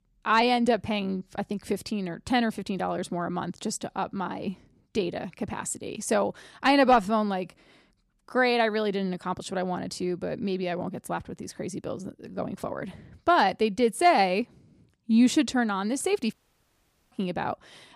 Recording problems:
audio cutting out; at 16 s for 1 s

